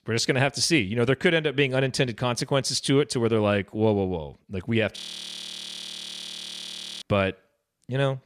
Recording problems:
audio freezing; at 5 s for 2 s

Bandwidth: 14.5 kHz